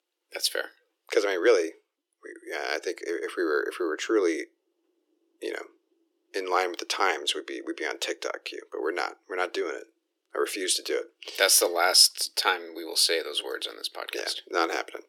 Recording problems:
thin; very; fading below 300 Hz

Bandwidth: 18 kHz